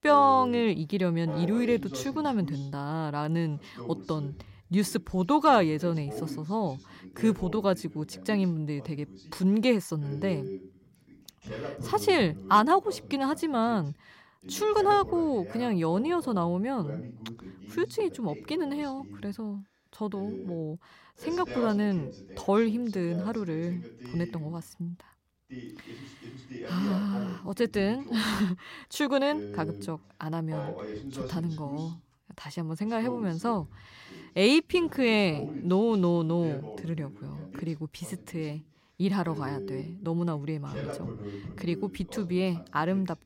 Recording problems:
voice in the background; noticeable; throughout; 15 dB below the speech

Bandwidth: 16 kHz